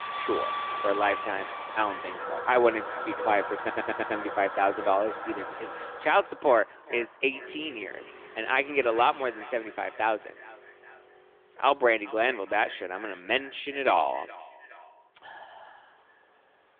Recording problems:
echo of what is said; faint; throughout; 420 ms later, 20 dB below the speech
phone-call audio; nothing above 3.5 kHz
household noises; loud; until 6 s; 8 dB below the speech
traffic noise; noticeable; throughout; 15 dB below the speech
audio stuttering; at 3.5 s

